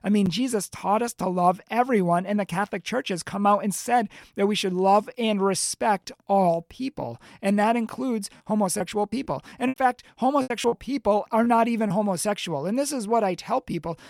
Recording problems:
choppy; very; from 9 to 12 s; 11% of the speech affected

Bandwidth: 18 kHz